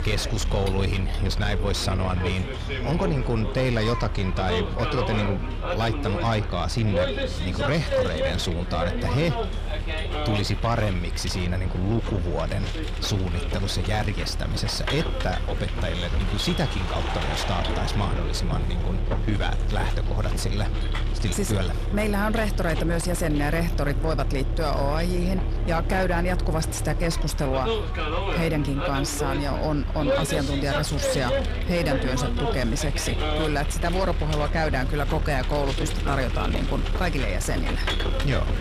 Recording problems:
distortion; slight; 10 dB below the speech
traffic noise; loud; throughout; 2 dB below the speech

